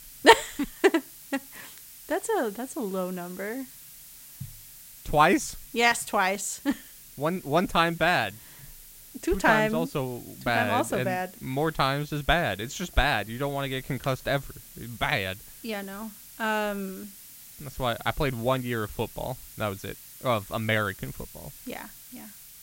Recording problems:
hiss; noticeable; throughout; 20 dB below the speech

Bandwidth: 16 kHz